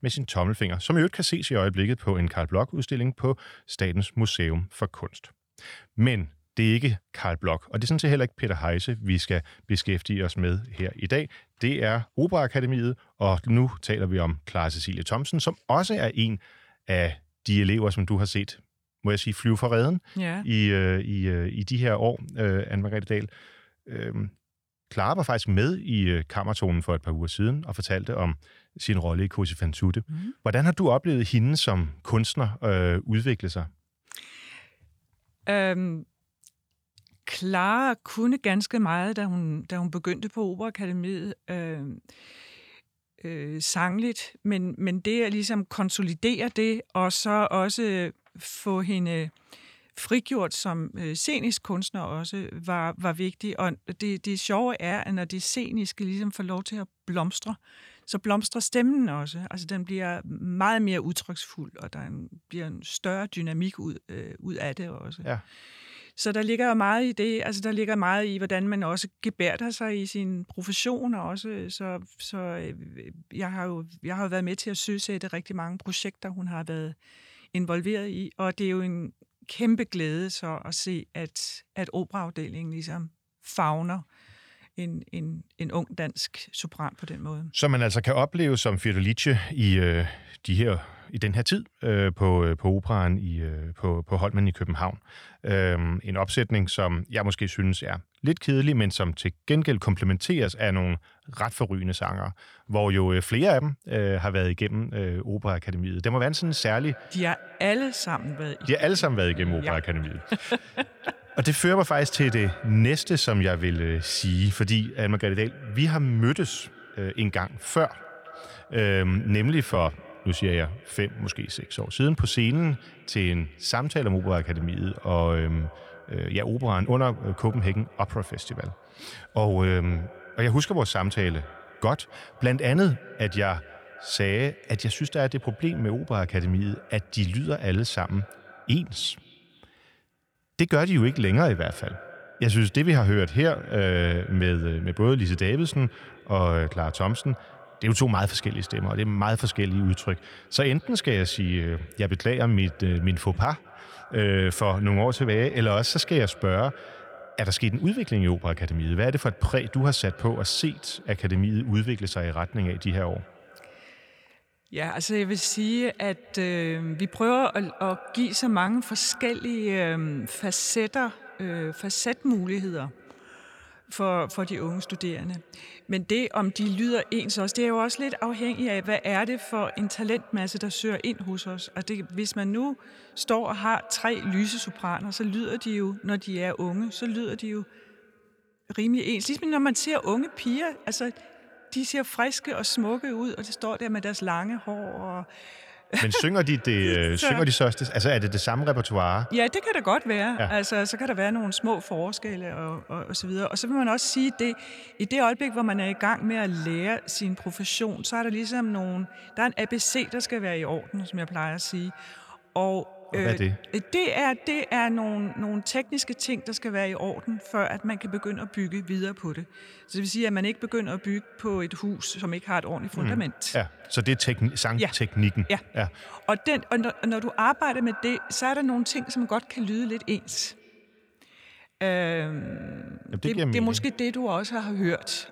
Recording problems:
echo of what is said; faint; from 1:46 on; 240 ms later, 20 dB below the speech

